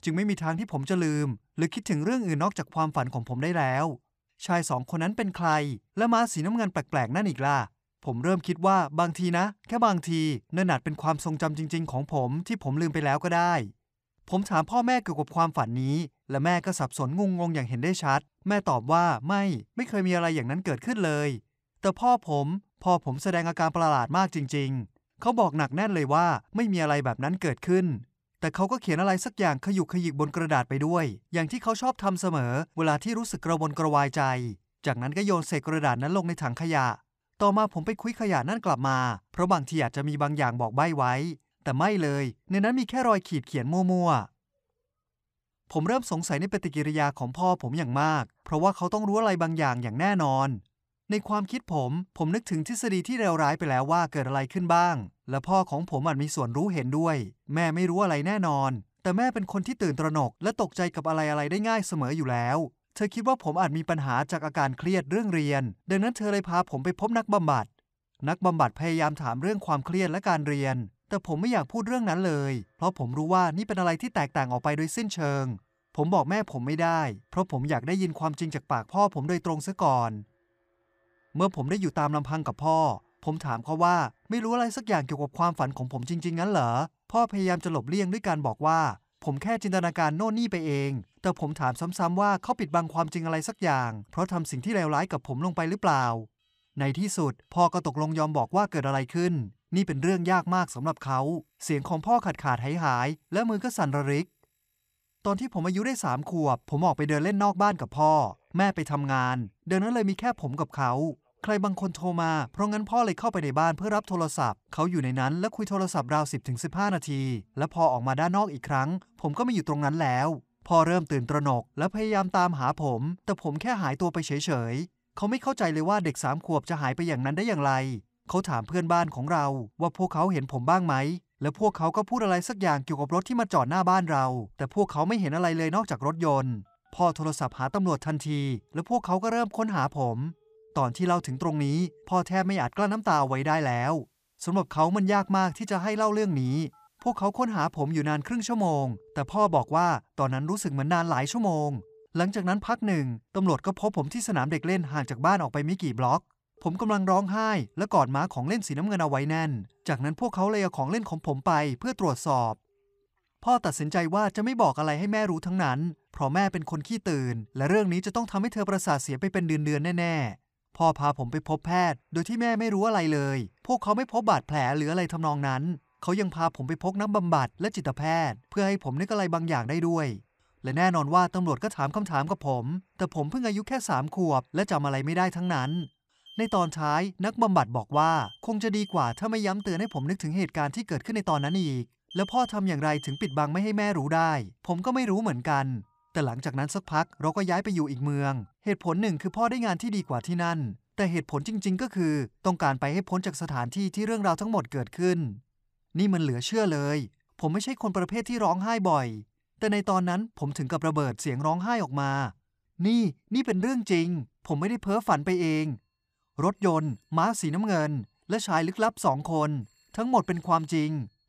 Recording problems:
alarms or sirens; faint; from 1:11 on; 25 dB below the speech

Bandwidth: 15 kHz